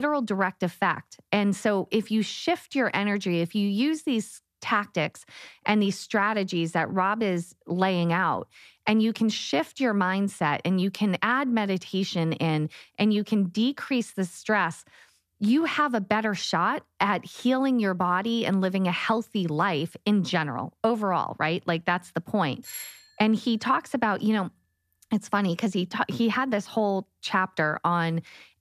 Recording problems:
abrupt cut into speech; at the start
doorbell; faint; at 23 s; peak 10 dB below the speech

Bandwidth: 14.5 kHz